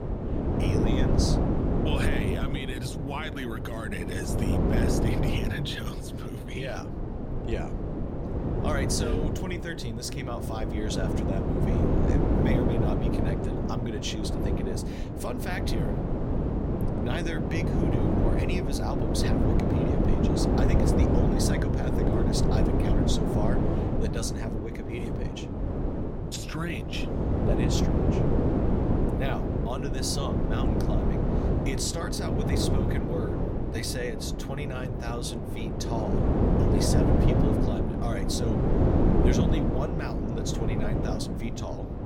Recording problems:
wind noise on the microphone; heavy; 3 dB above the speech

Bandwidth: 16.5 kHz